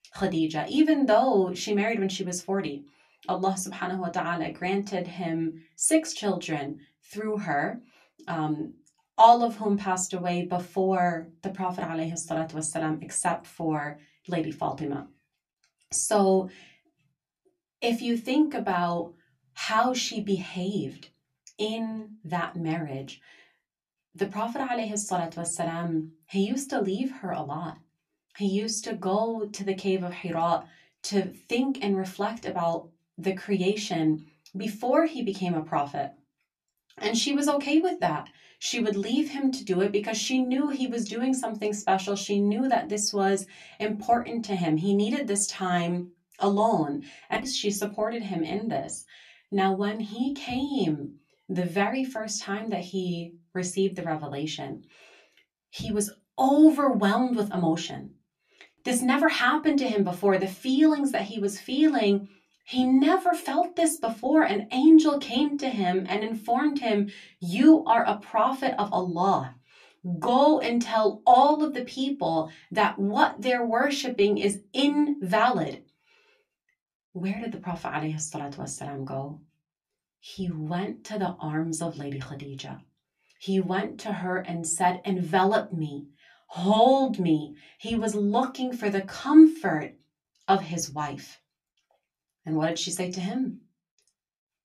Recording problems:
room echo; very slight; dies away in 0.2 s
off-mic speech; somewhat distant

